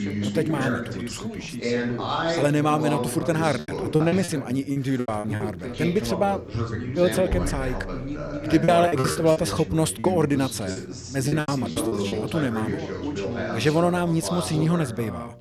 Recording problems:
background chatter; loud; throughout; 2 voices, 5 dB below the speech
choppy; very; from 3.5 to 5.5 s and from 8.5 to 12 s; 16% of the speech affected

